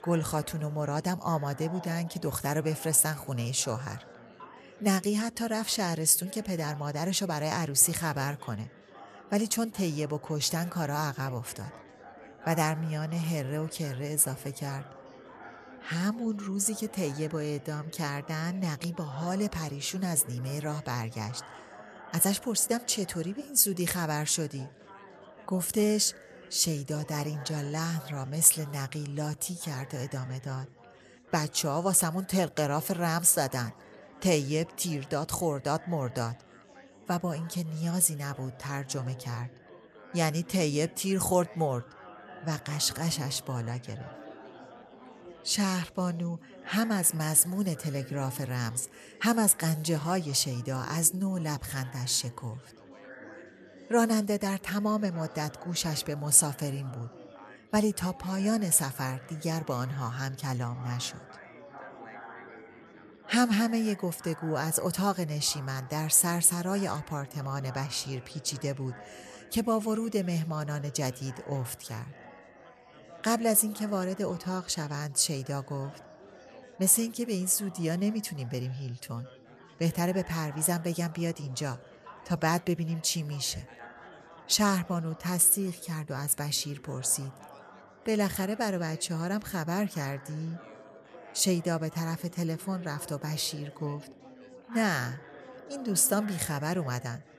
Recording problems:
chatter from many people; faint; throughout; 20 dB below the speech

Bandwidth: 13.5 kHz